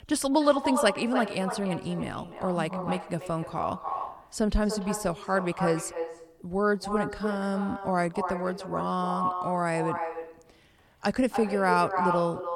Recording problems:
echo of what is said; strong; throughout; 290 ms later, 6 dB below the speech

